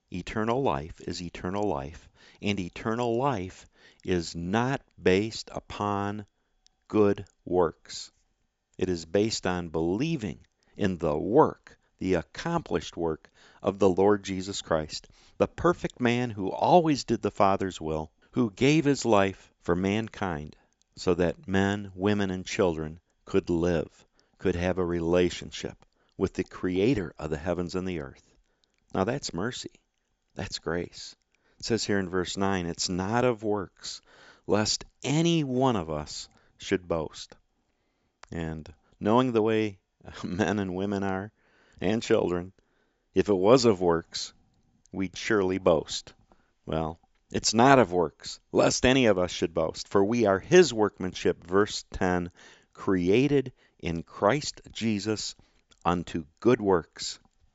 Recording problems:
high frequencies cut off; noticeable; nothing above 8 kHz

